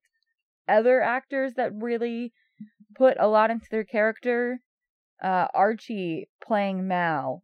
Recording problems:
muffled; slightly; fading above 3.5 kHz

